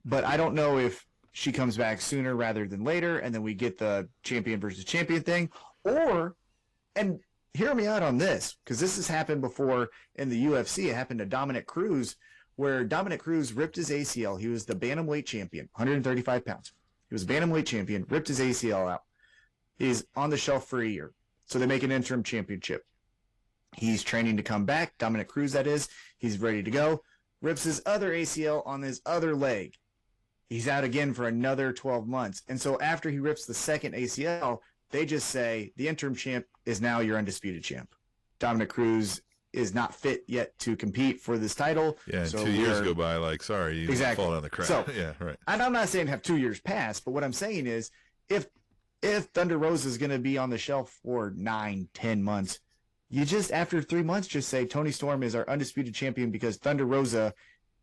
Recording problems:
distortion; slight; 10 dB below the speech
garbled, watery; slightly; nothing above 14 kHz

